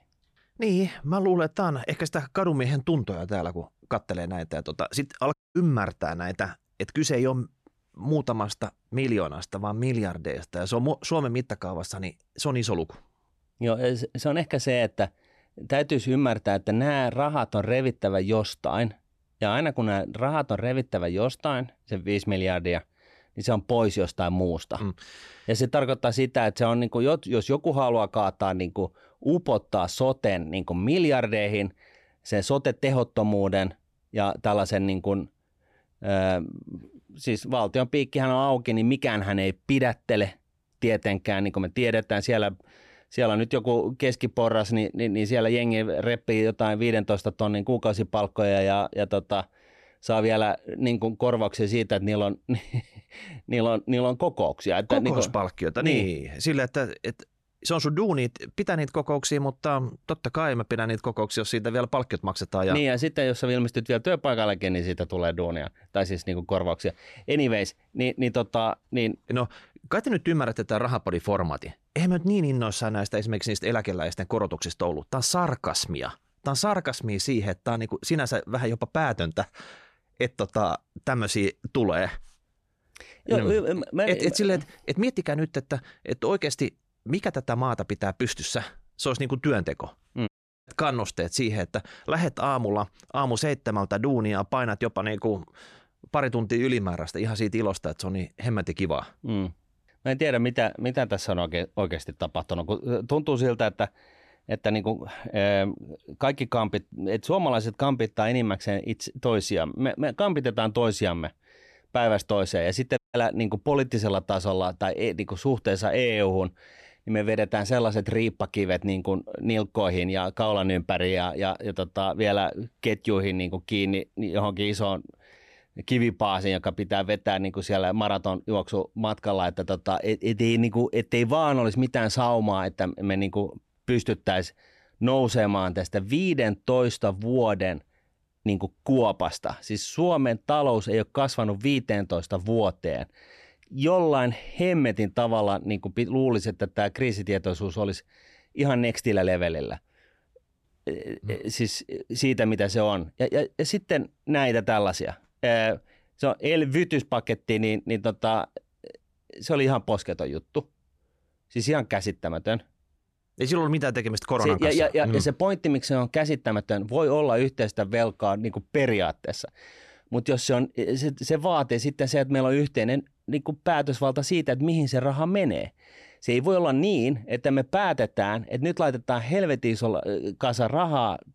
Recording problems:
audio cutting out; at 5.5 s, at 1:30 and at 1:53

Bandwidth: 13.5 kHz